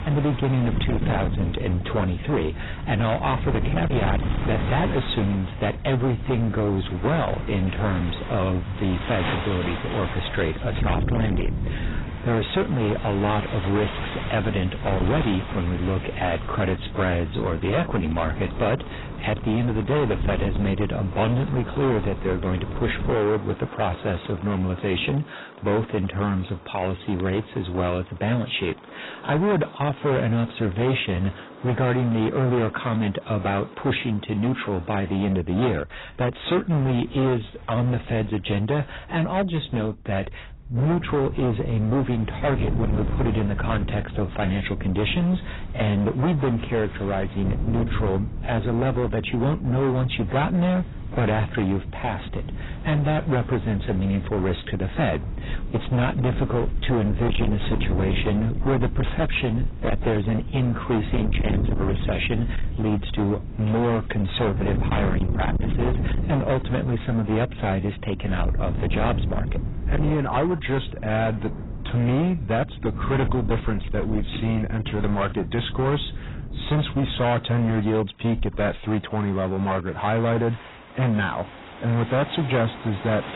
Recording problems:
distortion; heavy; 18% of the sound clipped
garbled, watery; badly; nothing above 4 kHz
rain or running water; noticeable; throughout; 15 dB below the speech
wind noise on the microphone; occasional gusts; until 23 s and from 41 s to 1:17; 15 dB below the speech

